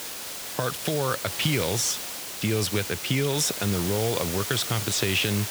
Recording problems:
hiss; loud; throughout; 5 dB below the speech

